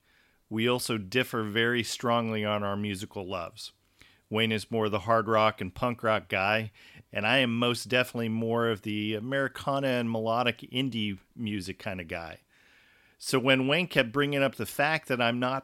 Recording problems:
none

